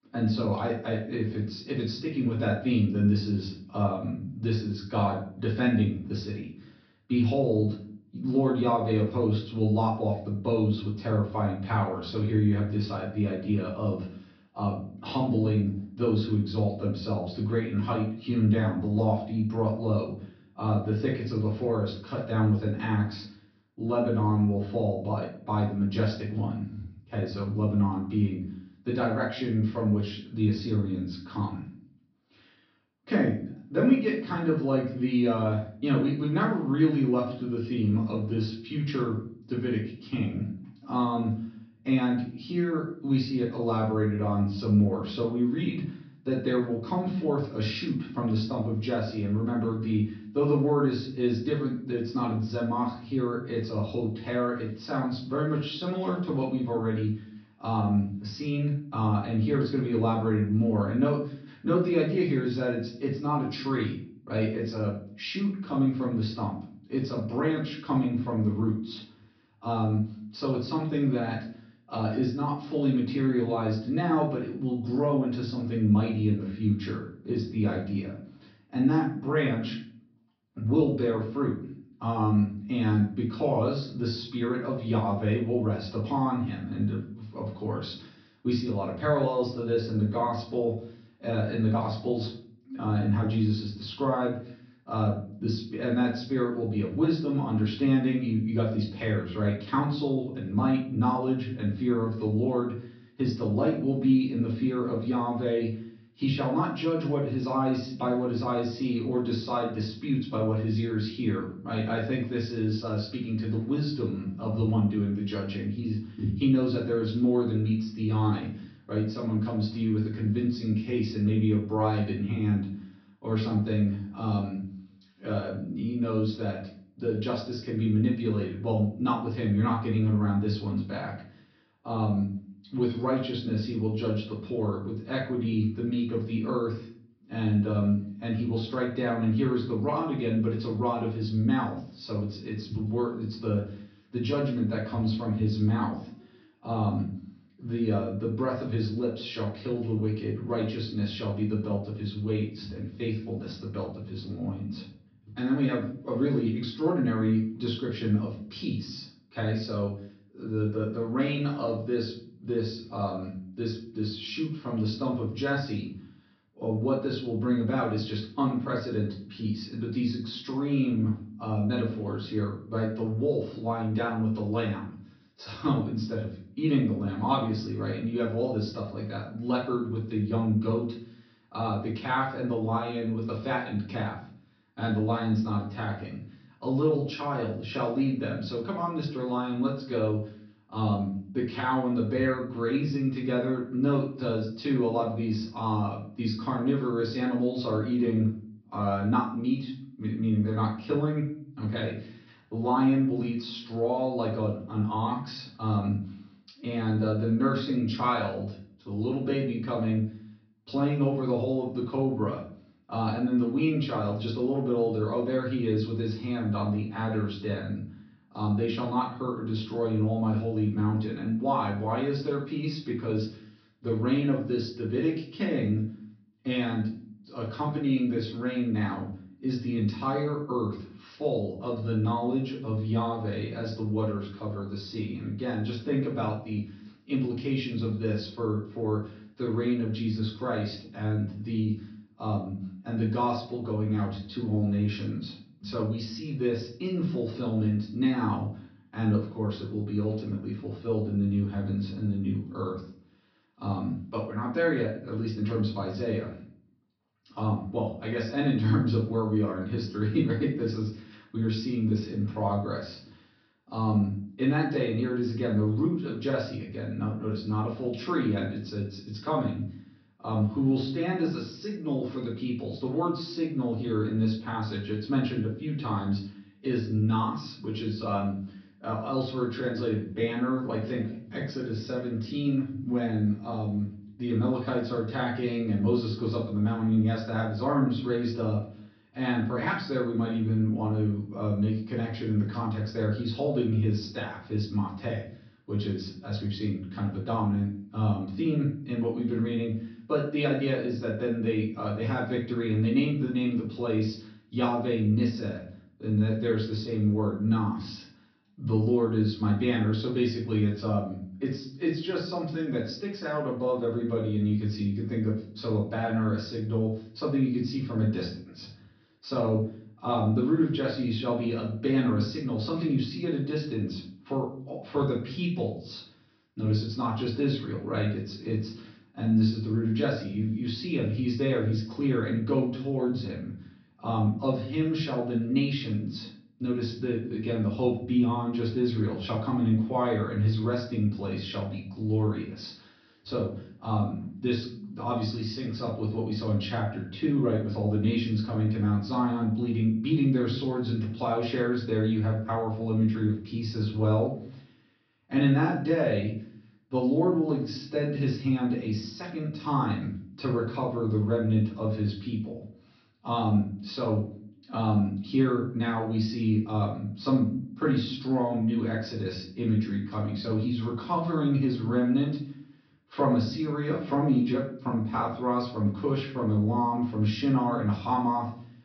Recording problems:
off-mic speech; far
room echo; noticeable; dies away in 0.4 s
high frequencies cut off; noticeable; nothing above 5.5 kHz

